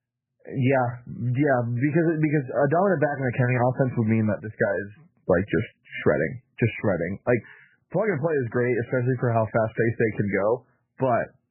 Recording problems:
garbled, watery; badly; nothing above 2.5 kHz

